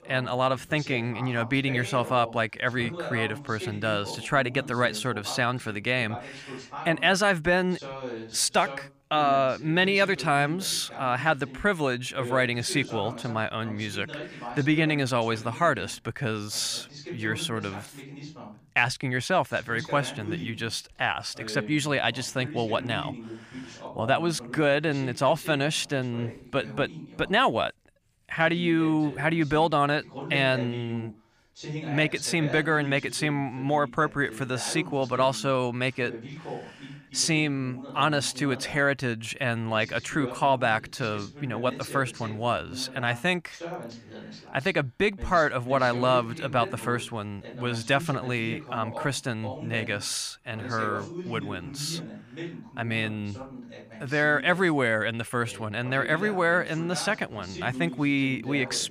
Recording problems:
voice in the background; noticeable; throughout; 15 dB below the speech

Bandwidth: 15 kHz